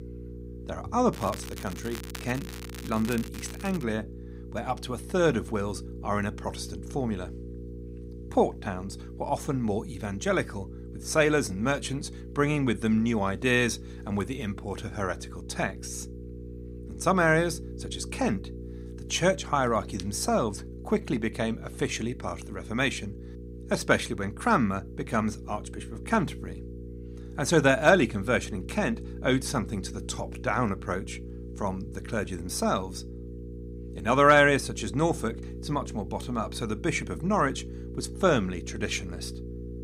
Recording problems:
electrical hum; noticeable; throughout; 60 Hz, 20 dB below the speech
crackling; noticeable; from 1 to 4 s; 15 dB below the speech

